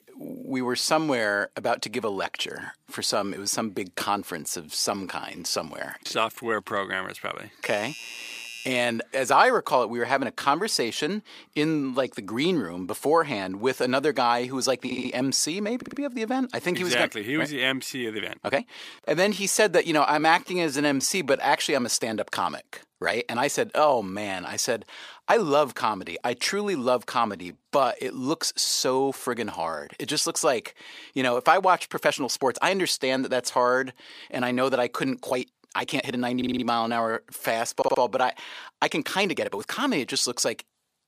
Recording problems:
thin; very slightly; fading below 300 Hz
uneven, jittery; strongly; from 6.5 to 40 s
doorbell; faint; from 7.5 to 8.5 s; peak 10 dB below the speech
audio stuttering; 4 times, first at 15 s

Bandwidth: 15 kHz